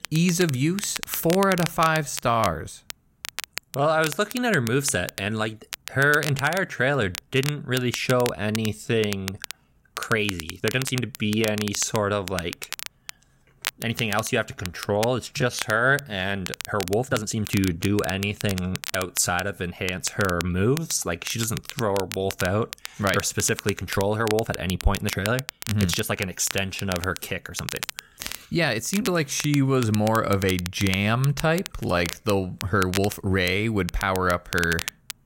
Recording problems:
crackle, like an old record; noticeable; 10 dB below the speech
uneven, jittery; strongly; from 1.5 to 33 s

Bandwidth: 16 kHz